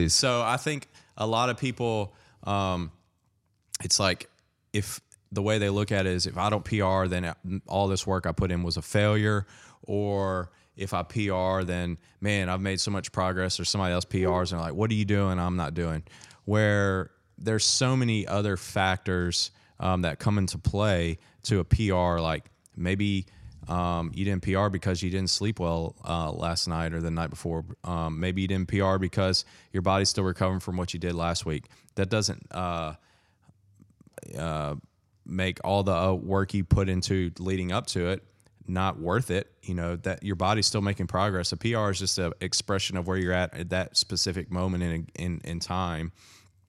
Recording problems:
abrupt cut into speech; at the start

